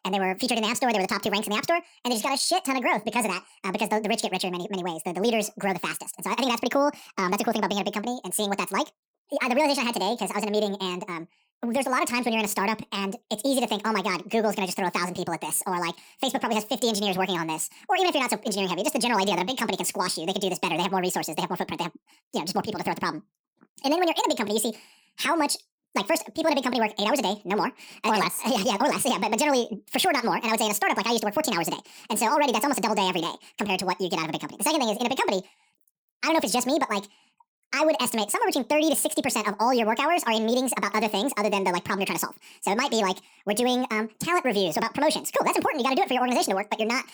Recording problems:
wrong speed and pitch; too fast and too high; 1.7 times normal speed

